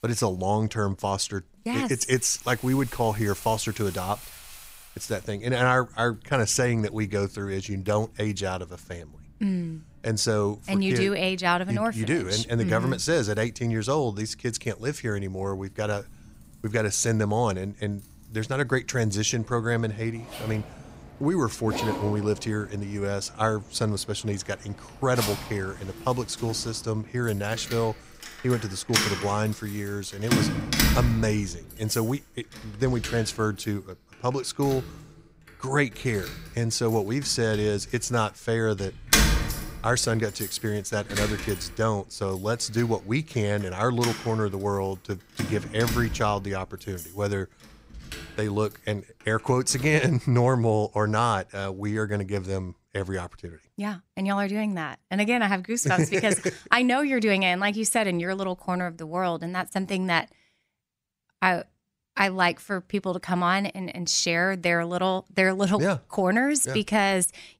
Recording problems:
household noises; loud; until 50 s; 5 dB below the speech

